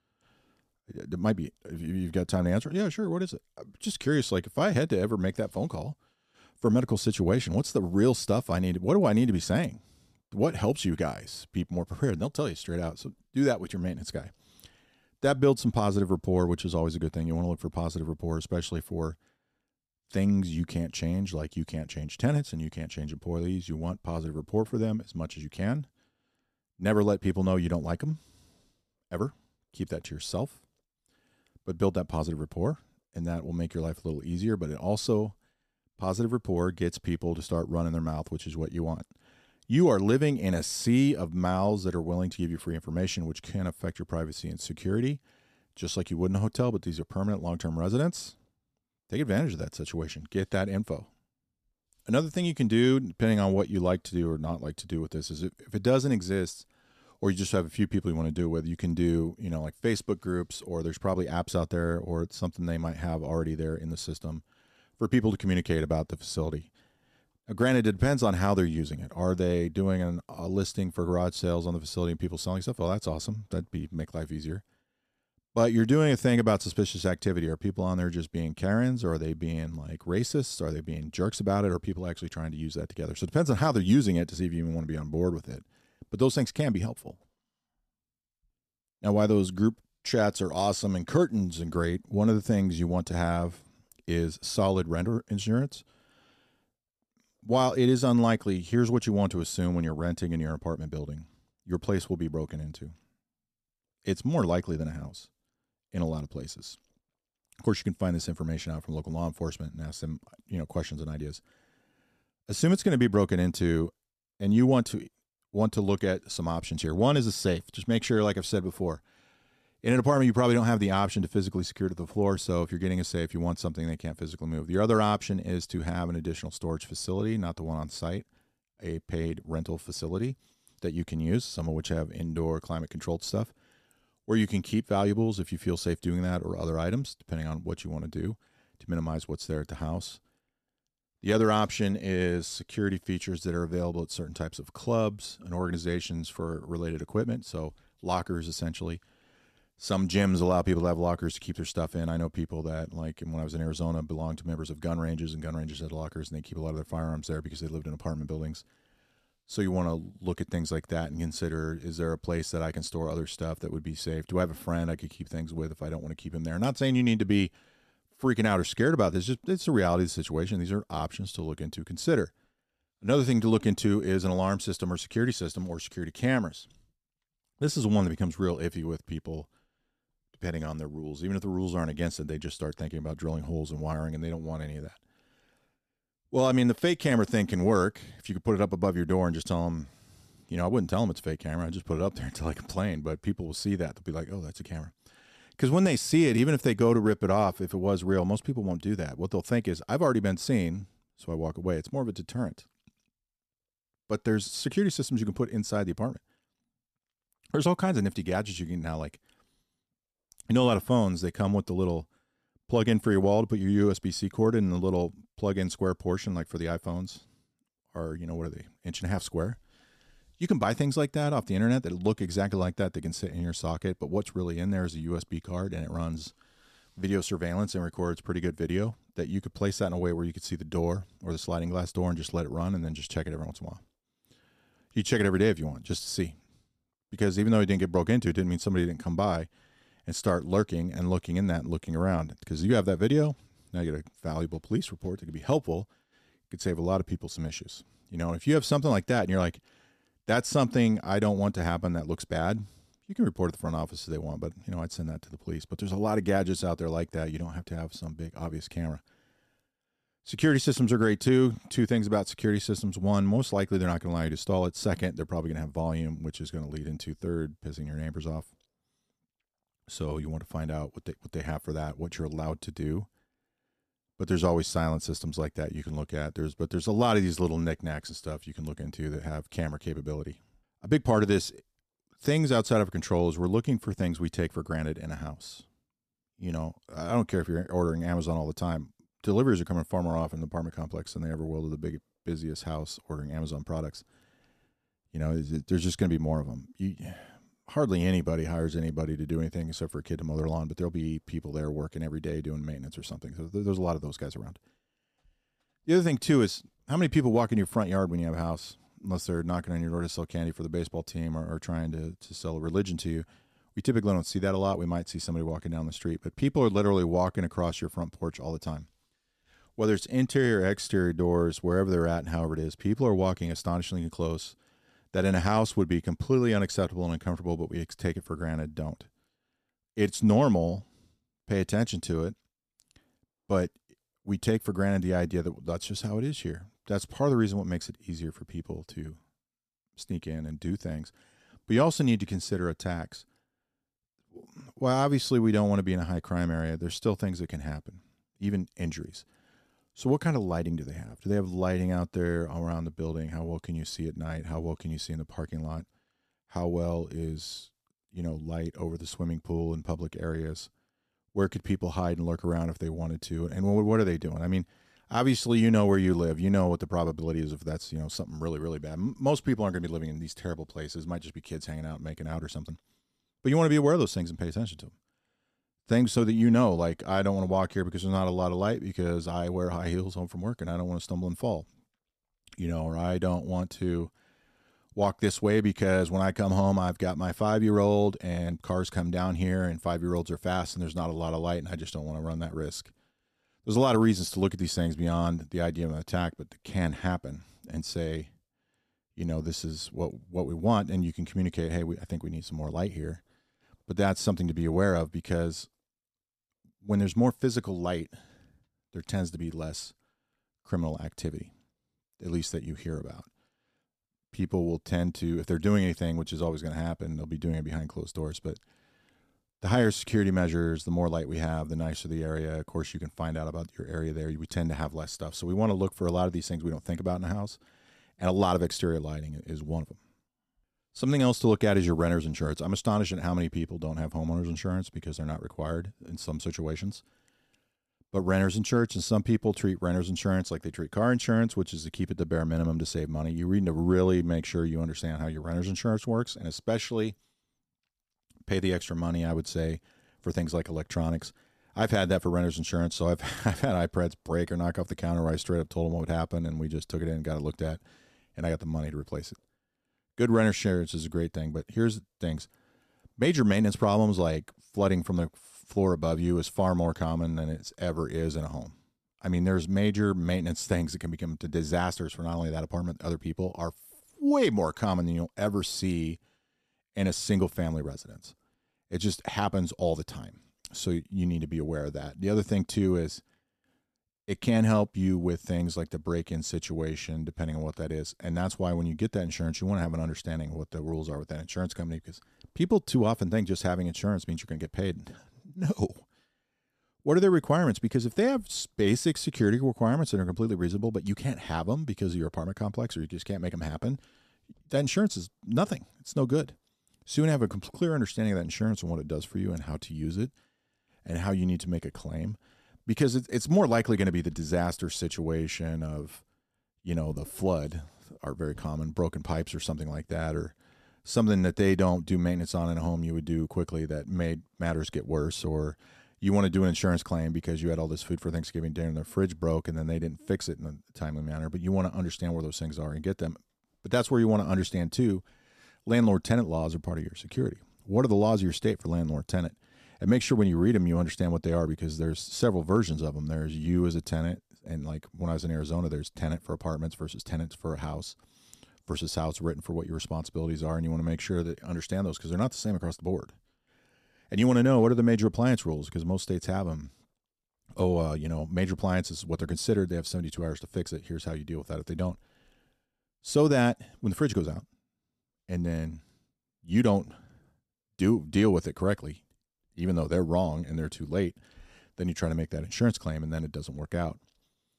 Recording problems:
none

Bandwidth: 14.5 kHz